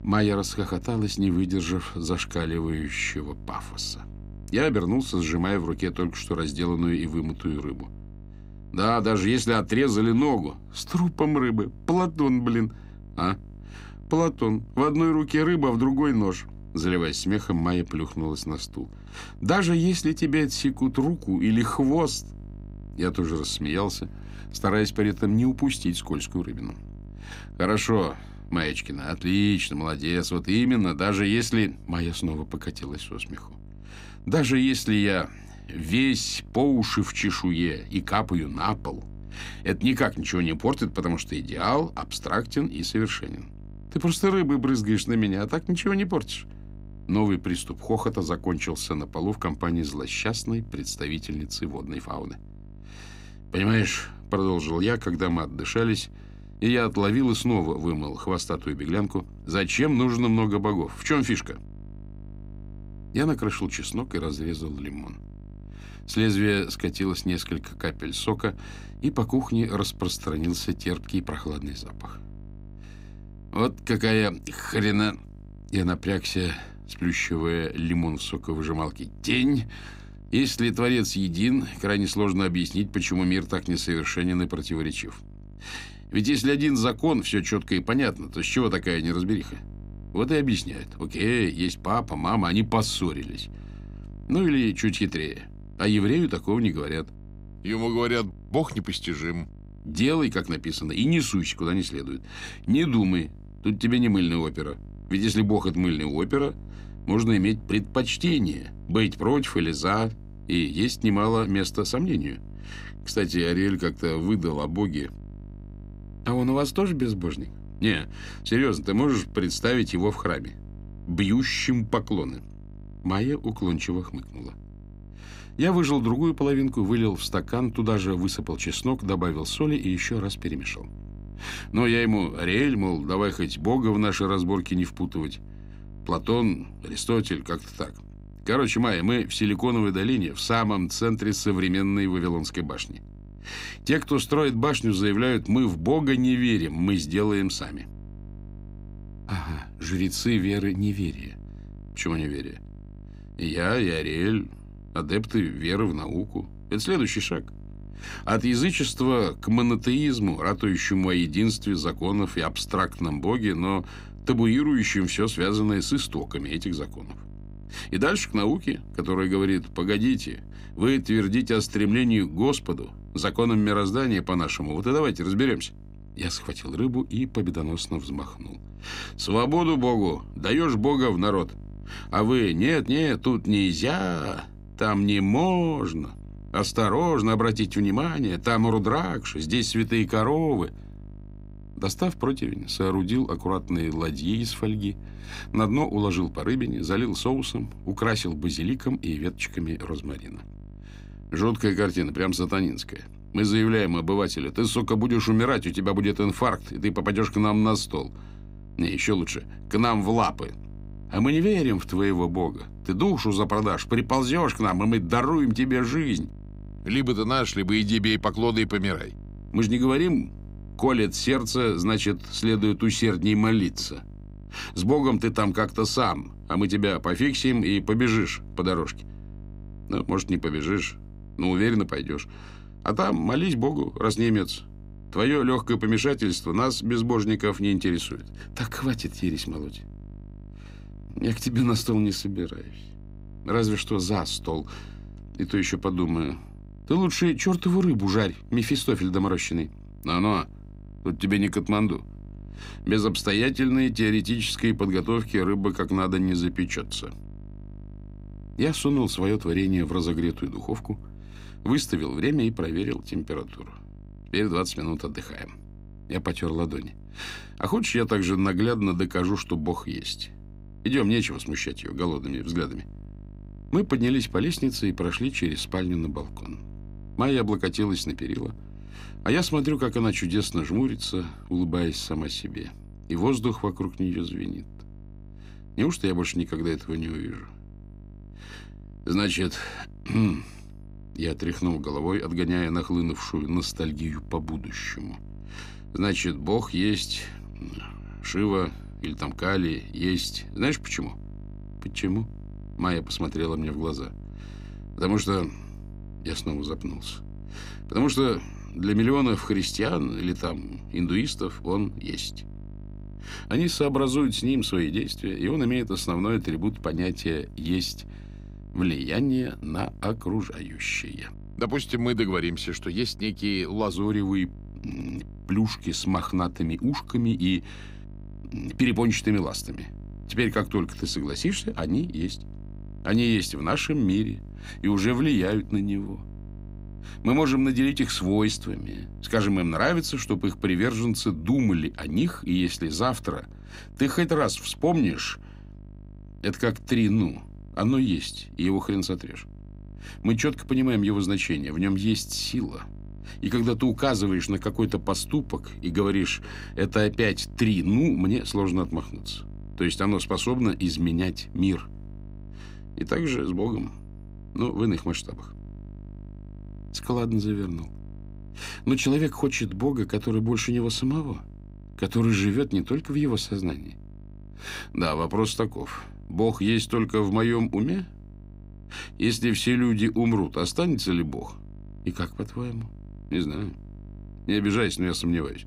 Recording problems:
electrical hum; faint; throughout; 50 Hz, 25 dB below the speech

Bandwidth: 15.5 kHz